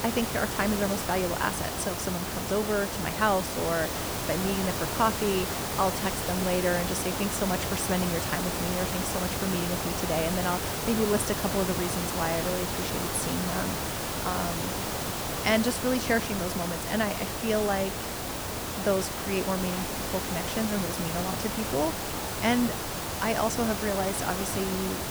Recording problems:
hiss; loud; throughout; 1 dB below the speech

